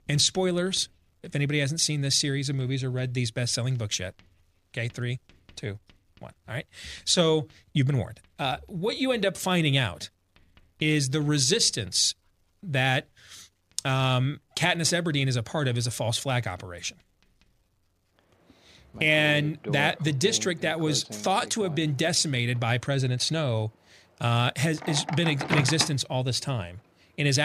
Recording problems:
household noises; noticeable; throughout; 10 dB below the speech
abrupt cut into speech; at the end

